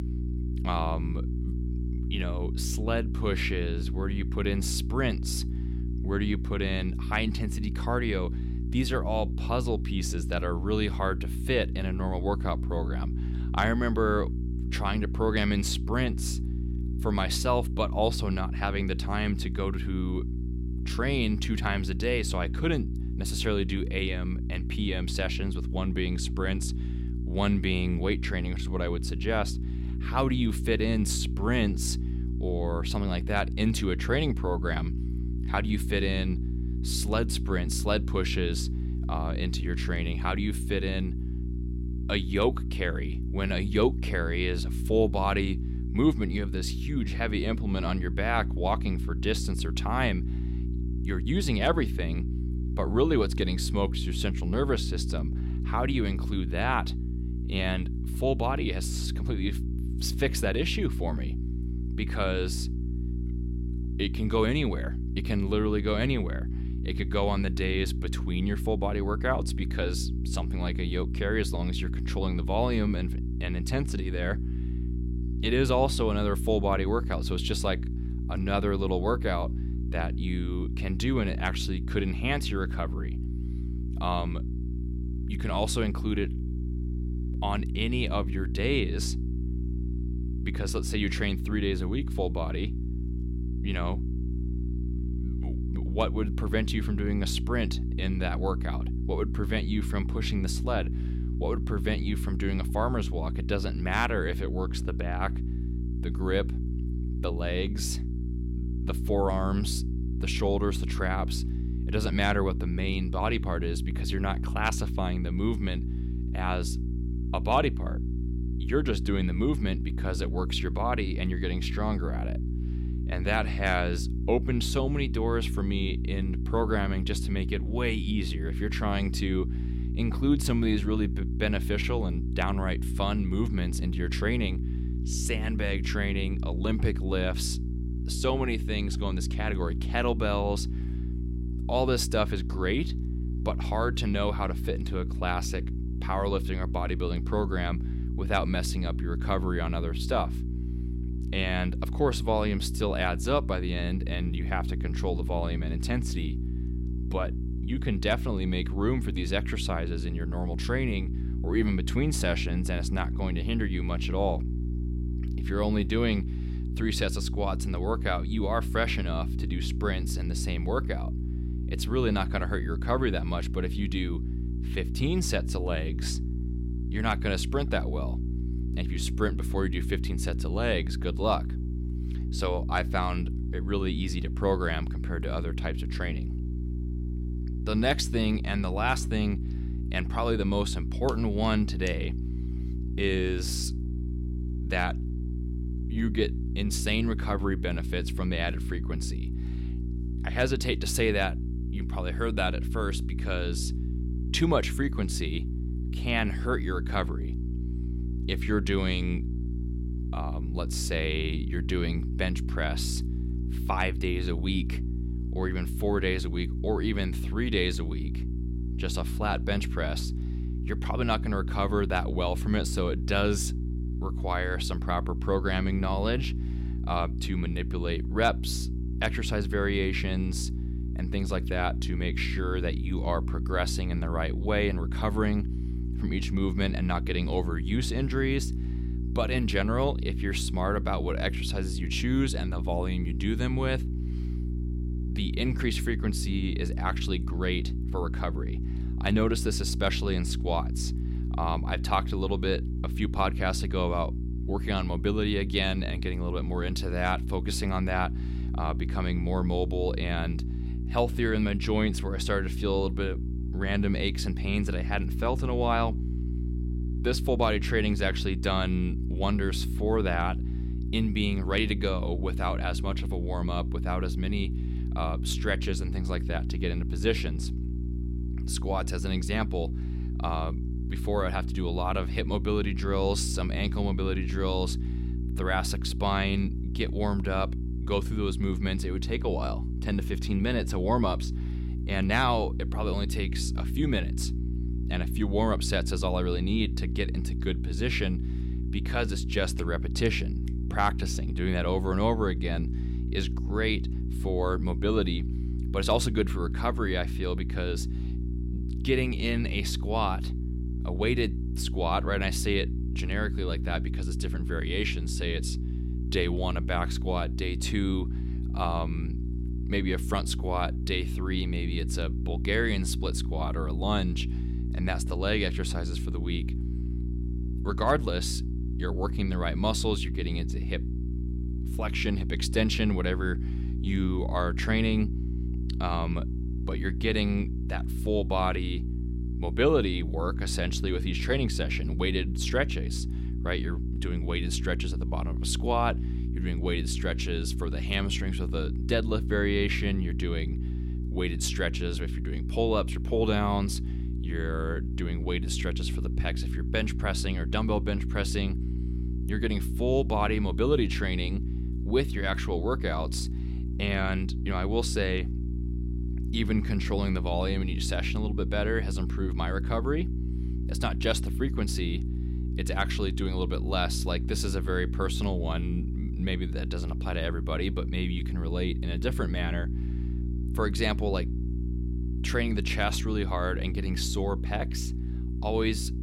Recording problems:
electrical hum; noticeable; throughout; 60 Hz, 10 dB below the speech

